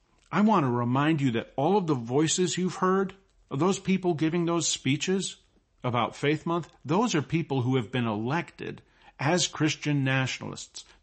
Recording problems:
garbled, watery; slightly; nothing above 8 kHz

